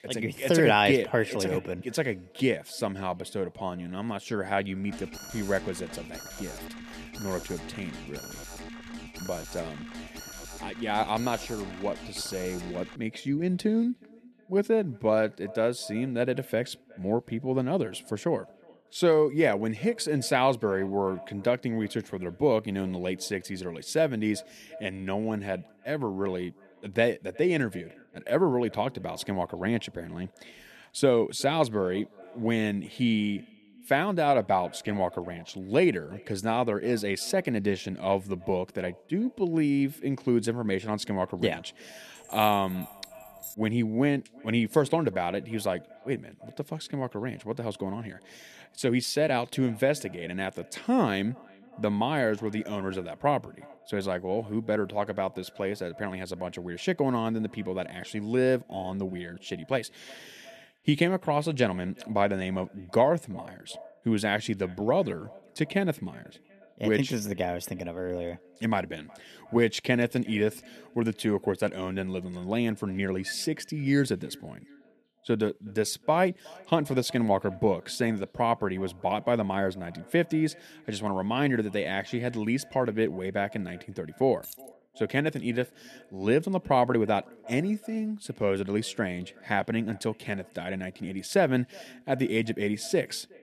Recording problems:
echo of what is said; faint; throughout; 370 ms later, 25 dB below the speech
alarm; faint; from 5 to 13 s; peak 10 dB below the speech
jangling keys; faint; from 42 to 44 s and at 1:24; peak 10 dB below the speech

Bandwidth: 13.5 kHz